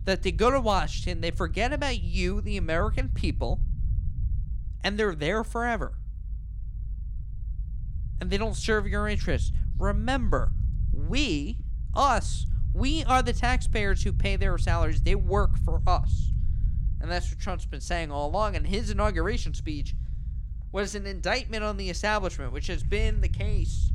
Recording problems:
low rumble; faint; throughout; 20 dB below the speech

